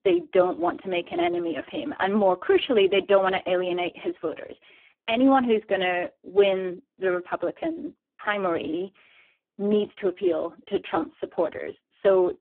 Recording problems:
phone-call audio; poor line

